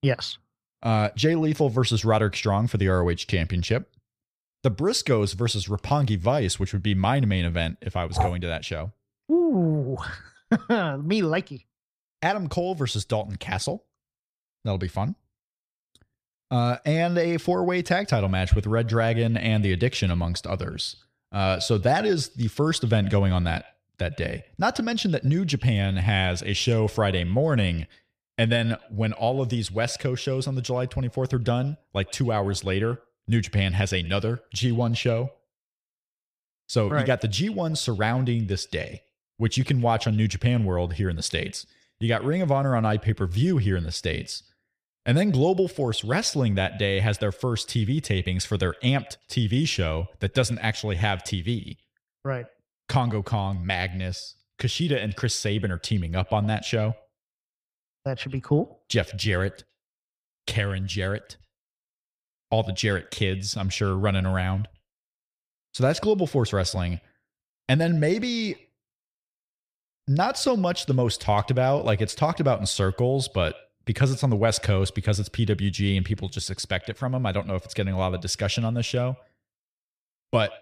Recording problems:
echo of what is said; faint; from 18 s on; 110 ms later, 25 dB below the speech

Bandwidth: 14.5 kHz